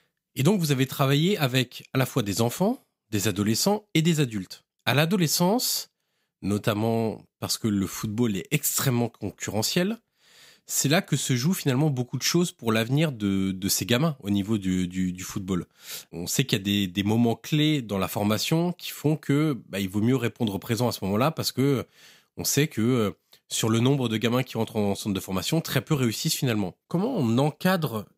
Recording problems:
none

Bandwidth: 15.5 kHz